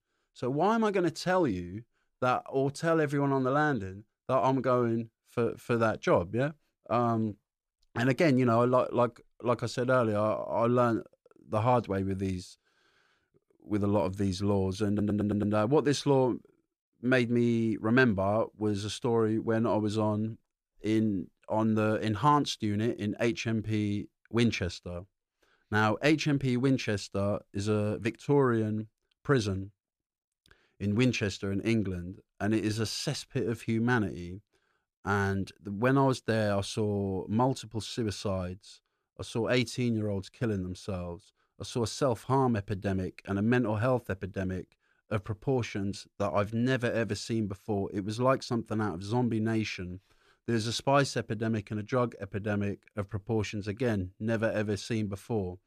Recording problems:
audio stuttering; at 15 s

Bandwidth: 14.5 kHz